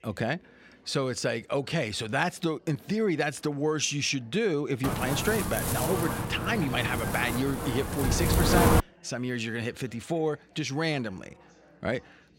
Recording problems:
wind noise on the microphone; heavy; from 5 to 9 s; as loud as the speech
chatter from many people; faint; throughout; 30 dB below the speech

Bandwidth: 16 kHz